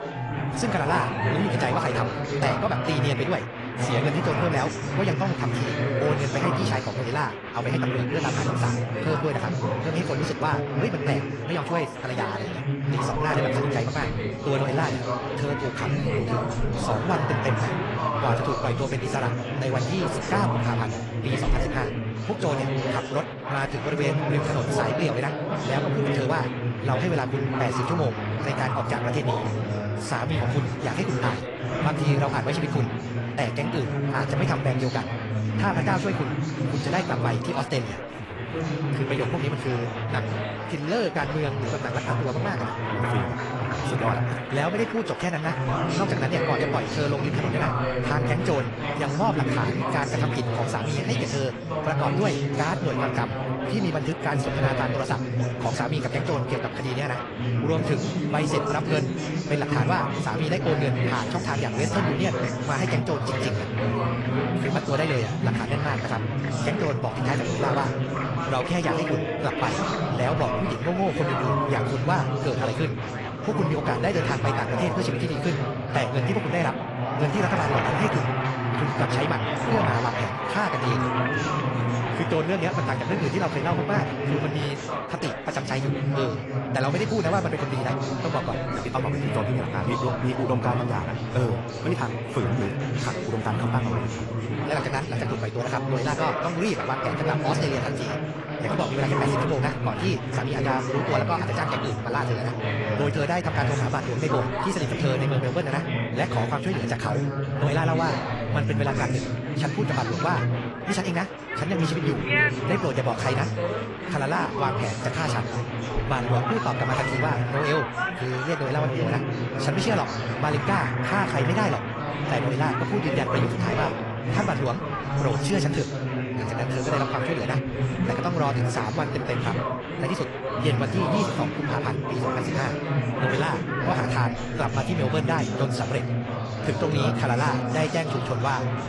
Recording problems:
wrong speed, natural pitch; too fast; 1.6 times normal speed
garbled, watery; slightly; nothing above 10.5 kHz
chatter from many people; very loud; throughout; 1 dB above the speech

